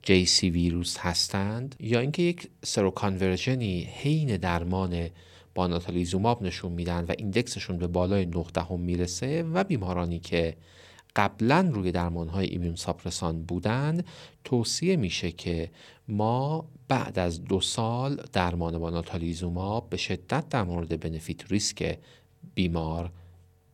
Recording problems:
none

